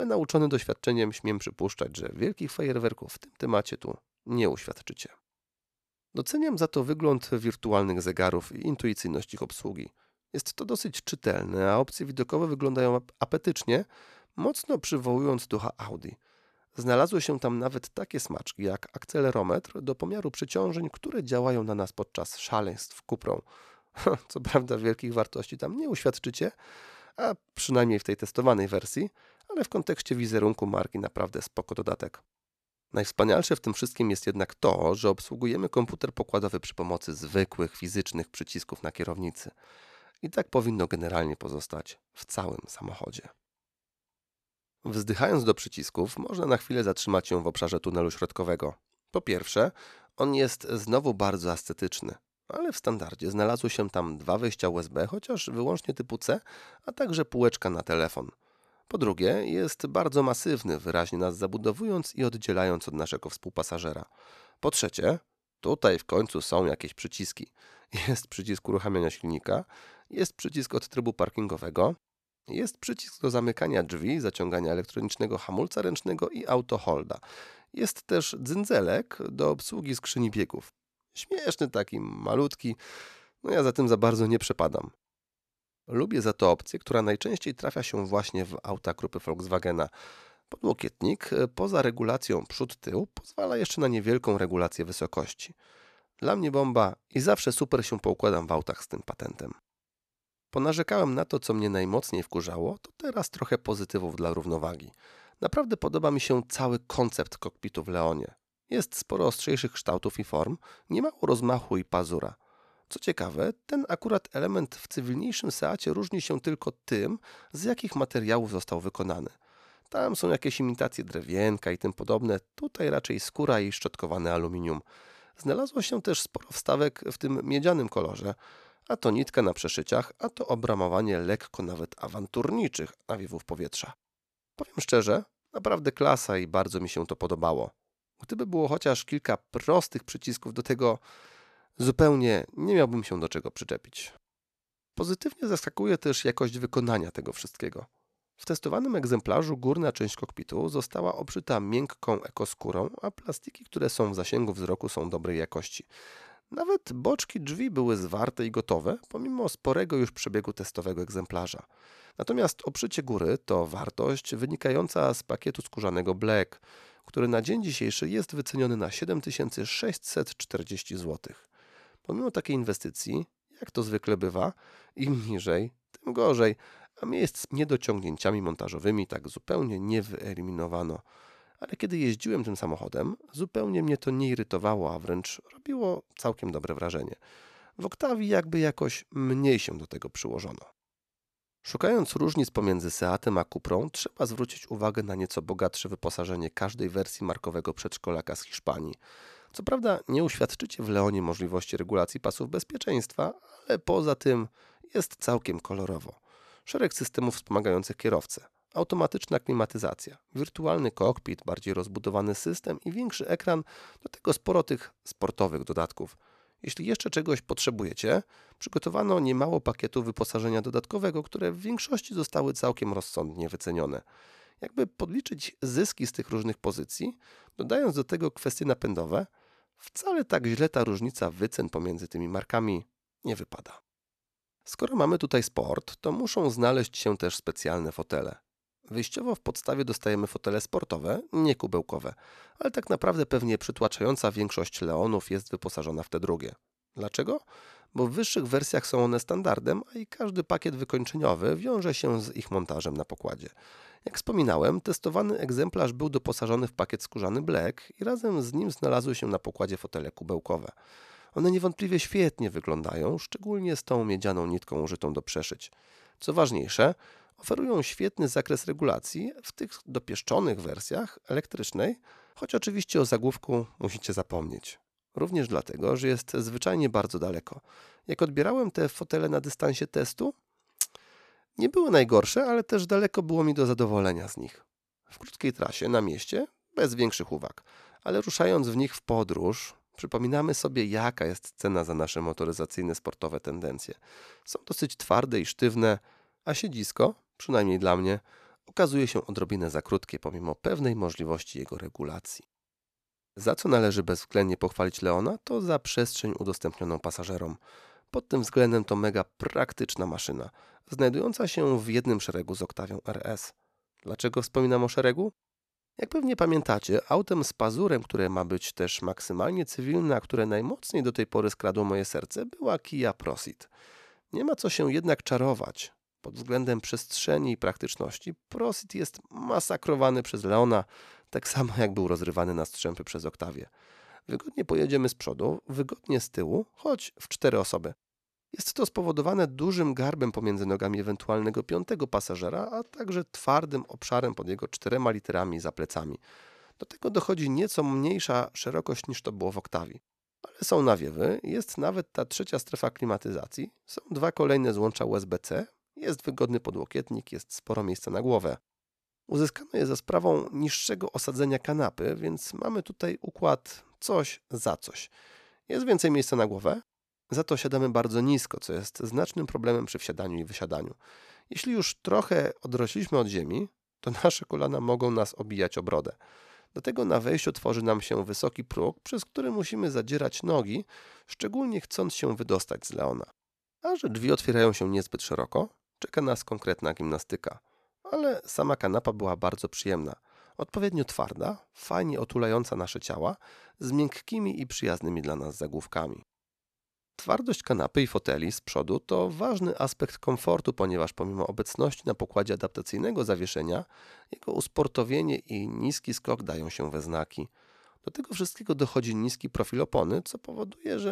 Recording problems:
abrupt cut into speech; at the start and the end

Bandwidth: 14 kHz